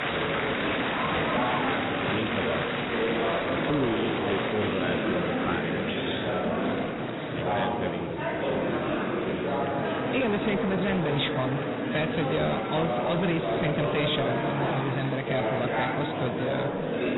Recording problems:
garbled, watery; badly; nothing above 4 kHz
distortion; slight; 15% of the sound clipped
murmuring crowd; very loud; throughout; 2 dB above the speech

